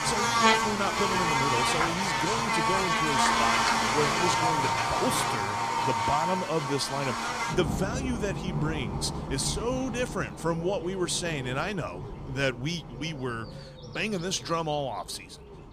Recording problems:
animal sounds; very loud; throughout; 4 dB above the speech

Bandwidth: 15 kHz